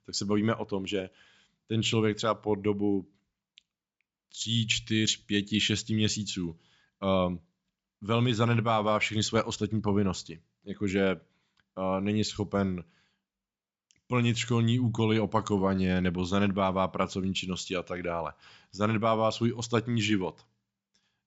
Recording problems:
high frequencies cut off; noticeable; nothing above 8 kHz

